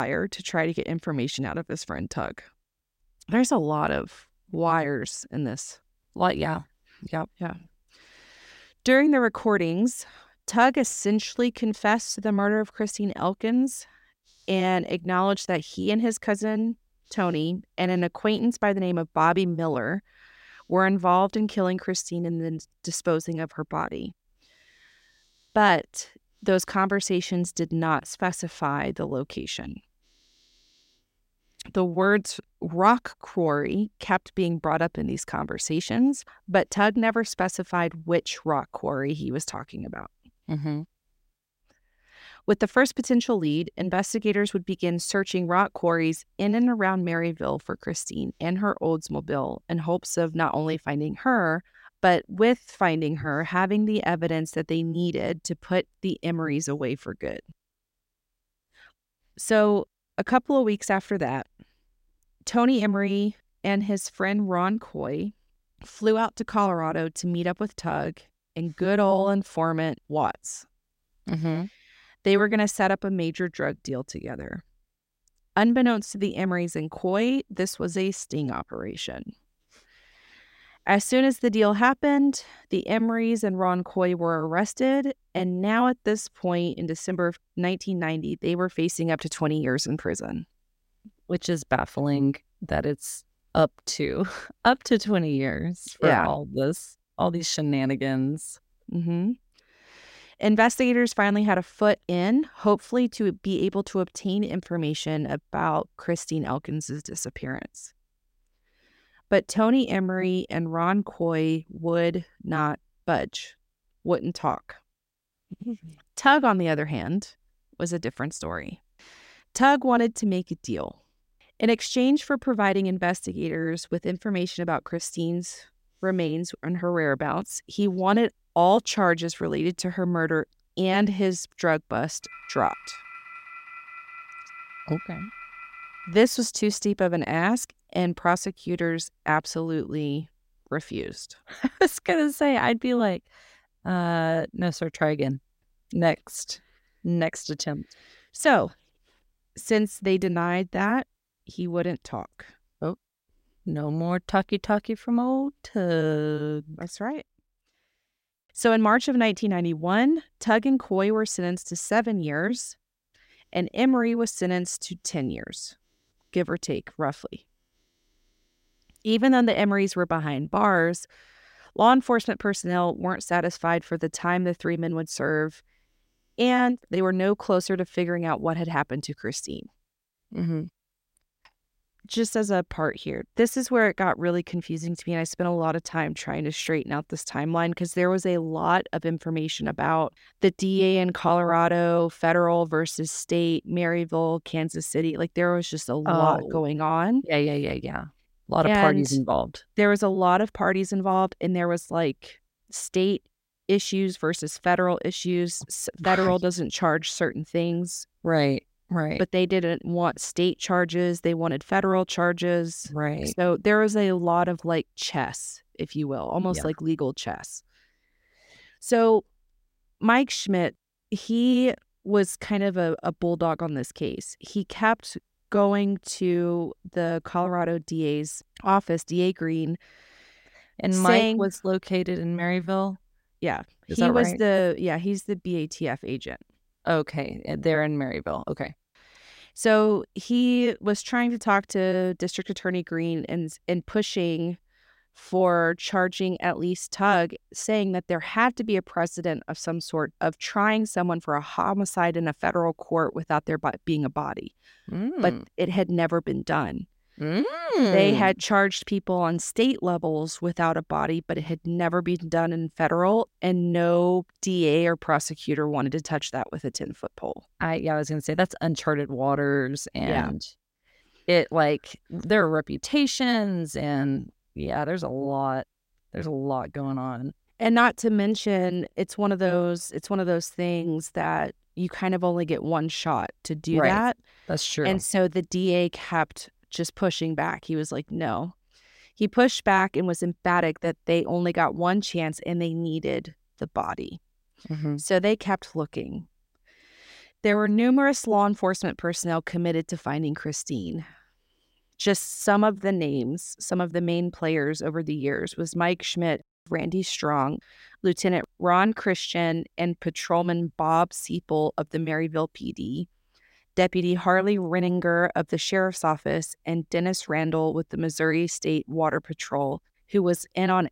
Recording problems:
abrupt cut into speech; at the start
phone ringing; faint; from 2:12 to 2:16; peak 15 dB below the speech

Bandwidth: 16 kHz